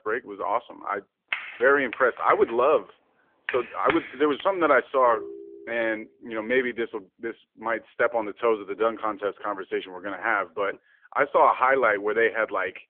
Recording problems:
phone-call audio; nothing above 3.5 kHz
keyboard typing; noticeable; from 1.5 to 4.5 s; peak 5 dB below the speech
phone ringing; faint; at 5 s; peak 15 dB below the speech

